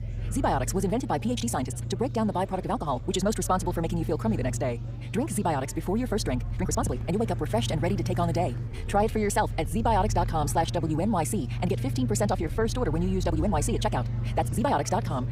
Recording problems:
wrong speed, natural pitch; too fast; 1.6 times normal speed
low rumble; noticeable; throughout; 20 dB below the speech
murmuring crowd; faint; throughout; 20 dB below the speech
uneven, jittery; strongly; from 1 to 15 s

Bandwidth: 15.5 kHz